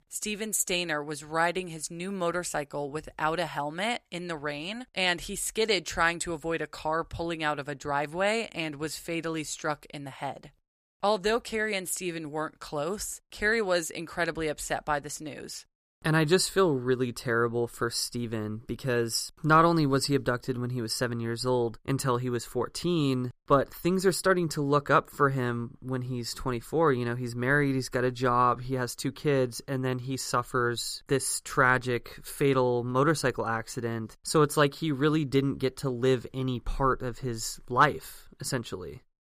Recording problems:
none

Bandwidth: 15 kHz